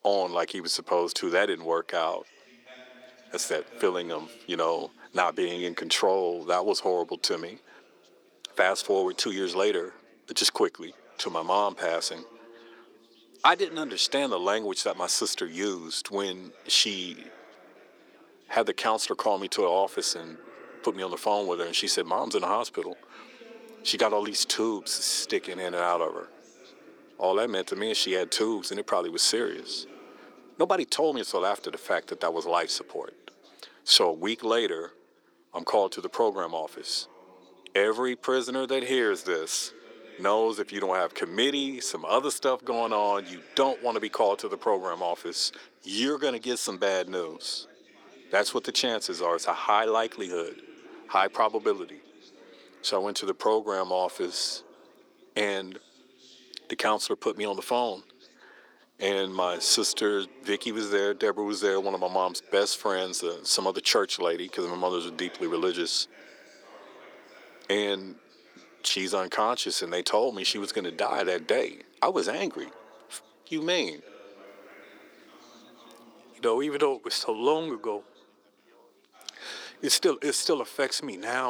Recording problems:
thin; very; fading below 350 Hz
background chatter; faint; throughout; 4 voices, 25 dB below the speech
abrupt cut into speech; at the end

